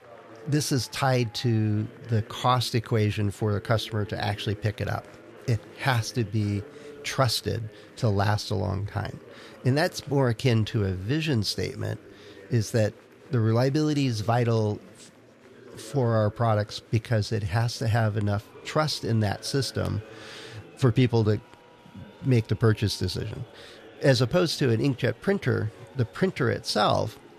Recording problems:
chatter from many people; faint; throughout; 20 dB below the speech

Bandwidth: 13.5 kHz